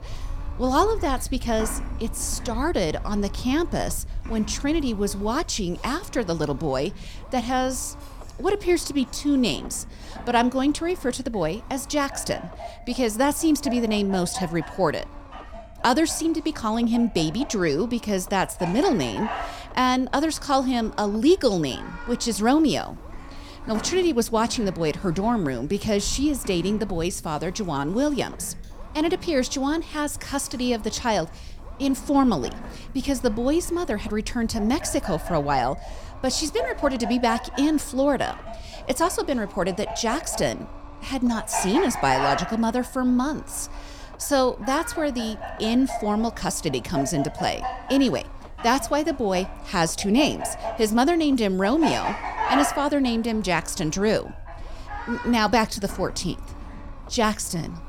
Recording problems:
animal sounds; noticeable; throughout; 10 dB below the speech
low rumble; faint; throughout; 20 dB below the speech

